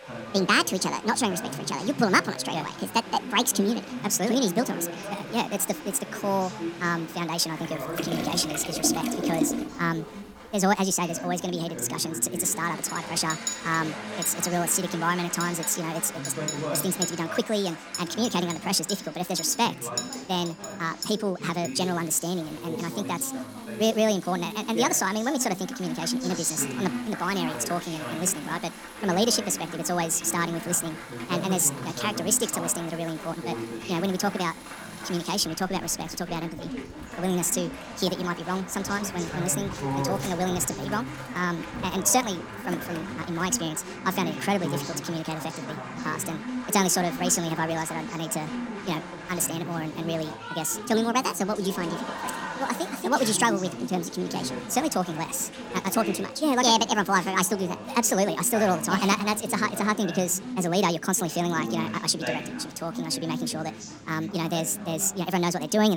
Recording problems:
wrong speed and pitch; too fast and too high; 1.6 times normal speed
crowd noise; noticeable; throughout; 15 dB below the speech
household noises; noticeable; until 44 s; 10 dB below the speech
background chatter; noticeable; throughout; 2 voices, 10 dB below the speech
abrupt cut into speech; at the end

